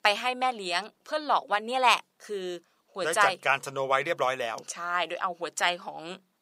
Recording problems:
thin; very; fading below 500 Hz

